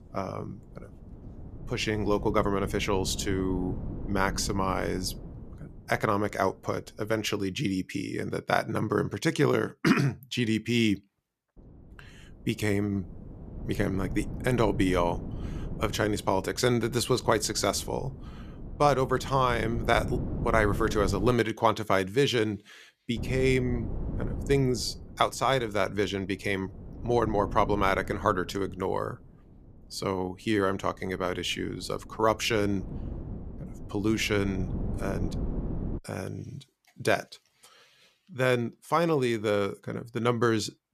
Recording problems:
wind noise on the microphone; occasional gusts; until 7.5 s, from 12 to 21 s and from 23 to 36 s; 20 dB below the speech

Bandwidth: 14.5 kHz